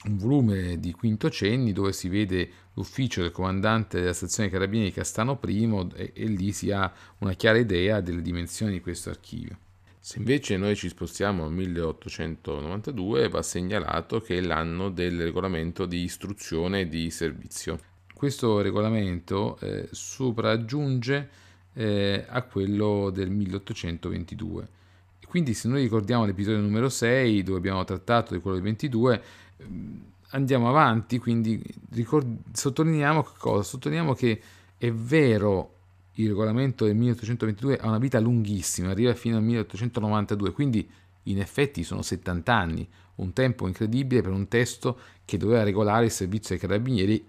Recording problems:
none

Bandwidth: 14.5 kHz